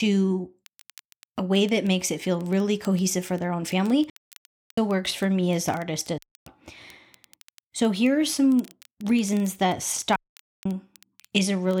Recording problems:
crackle, like an old record; faint; 30 dB below the speech
abrupt cut into speech; at the start and the end
audio cutting out; at 4 s for 0.5 s, at 6 s and at 10 s

